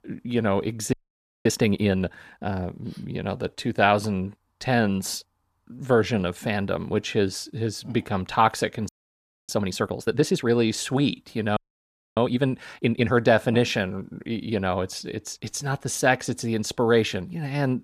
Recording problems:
audio freezing; at 1 s for 0.5 s, at 9 s for 0.5 s and at 12 s for 0.5 s

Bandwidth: 14.5 kHz